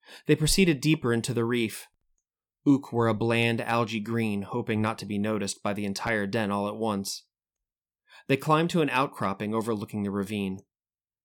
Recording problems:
none

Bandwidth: 18 kHz